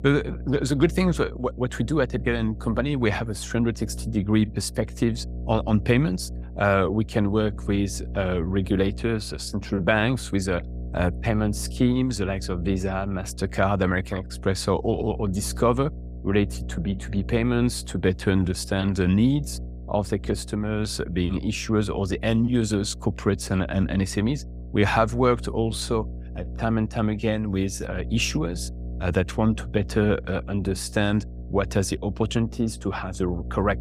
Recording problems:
electrical hum; faint; throughout; 60 Hz, 20 dB below the speech

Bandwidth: 15.5 kHz